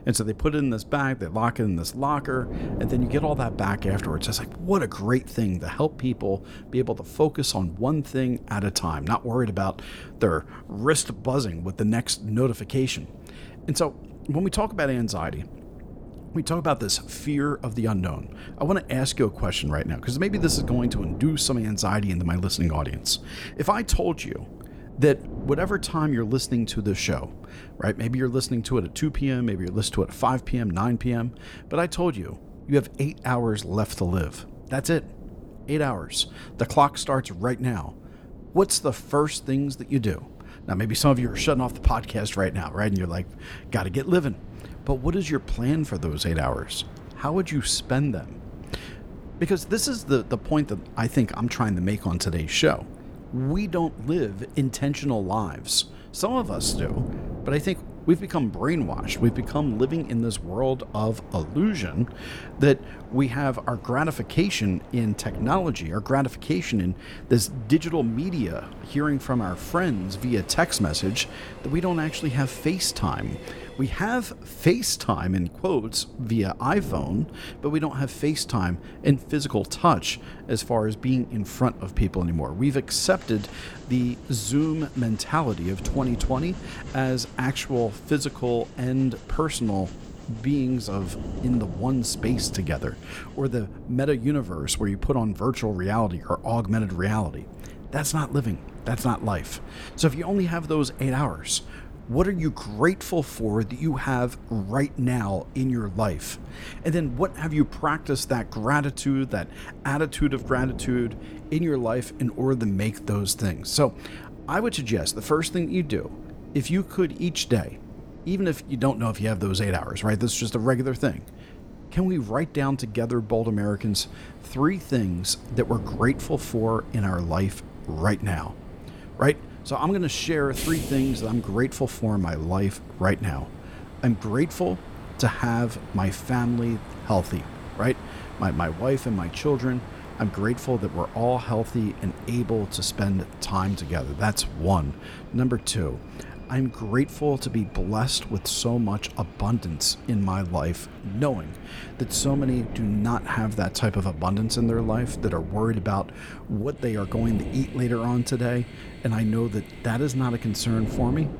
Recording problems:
wind noise on the microphone; occasional gusts; 20 dB below the speech
train or aircraft noise; faint; from 39 s on; 20 dB below the speech

